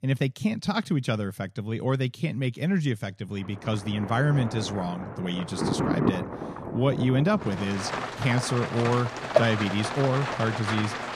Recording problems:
rain or running water; loud; from 3.5 s on; 4 dB below the speech

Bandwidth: 14.5 kHz